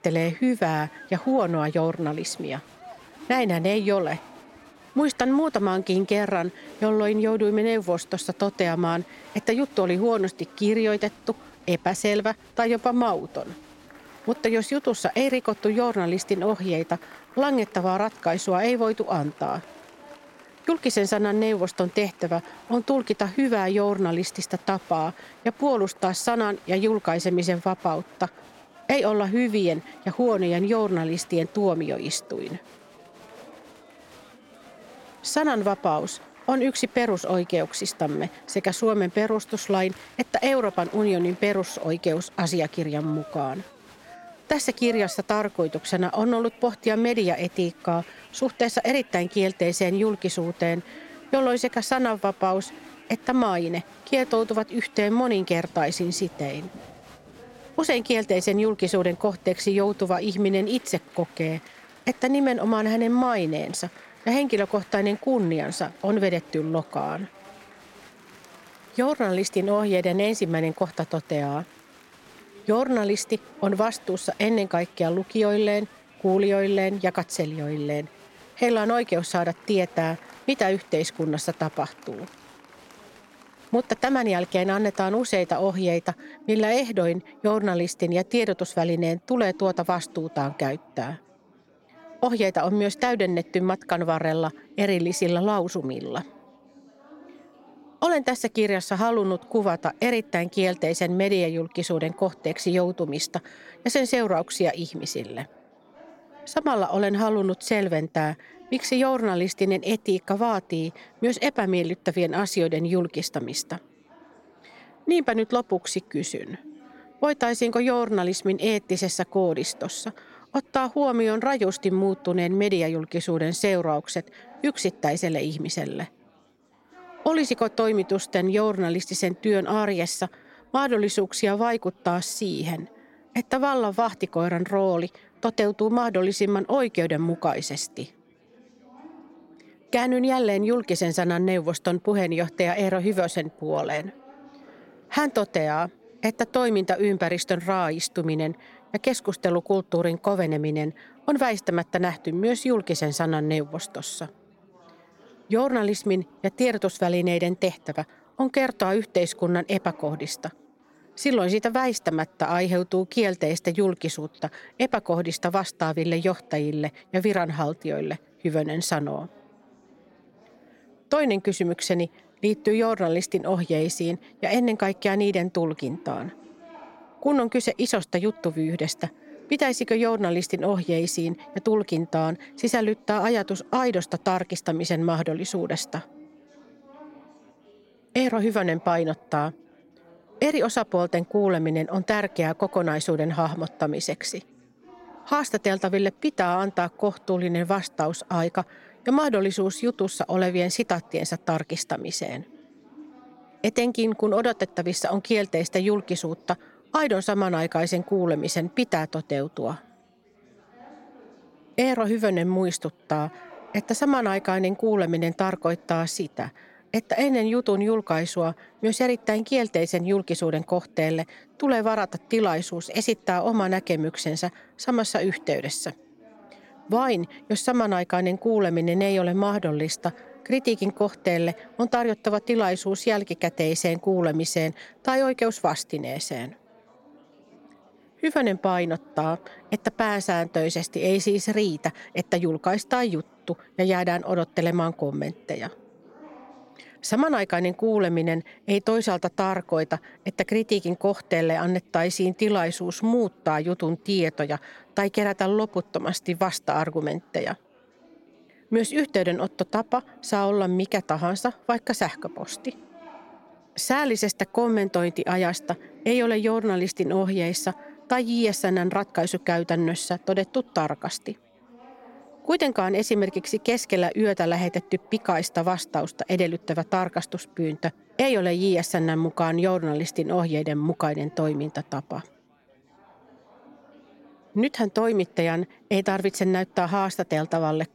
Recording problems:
chatter from many people; faint; throughout; 25 dB below the speech

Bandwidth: 16.5 kHz